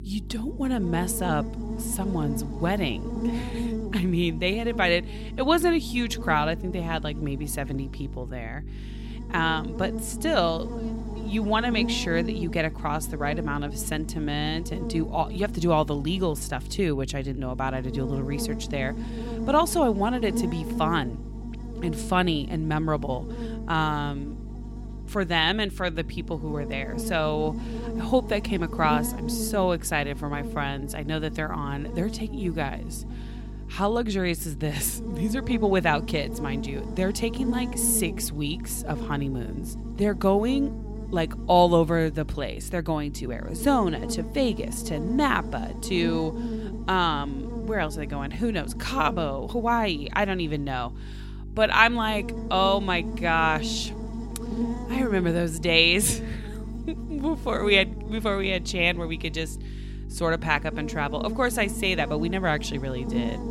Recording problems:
electrical hum; noticeable; throughout; 50 Hz, 15 dB below the speech

